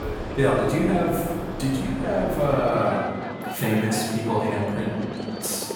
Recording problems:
off-mic speech; far
room echo; noticeable; dies away in 1.5 s
train or aircraft noise; loud; throughout; 8 dB below the speech

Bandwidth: 18 kHz